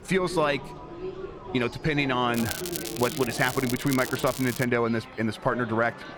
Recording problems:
crackling; loud; from 2.5 to 4.5 s; 9 dB below the speech
chatter from many people; noticeable; throughout; 15 dB below the speech
alarms or sirens; faint; throughout; 25 dB below the speech
background music; faint; throughout; 25 dB below the speech
train or aircraft noise; faint; throughout; 25 dB below the speech

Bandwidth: 18.5 kHz